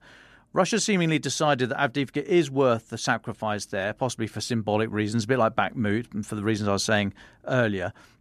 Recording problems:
none

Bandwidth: 13.5 kHz